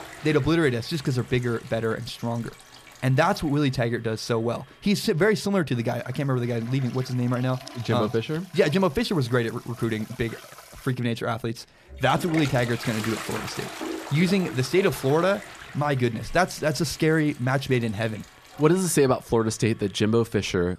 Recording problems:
household noises; noticeable; throughout; 15 dB below the speech

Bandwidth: 14.5 kHz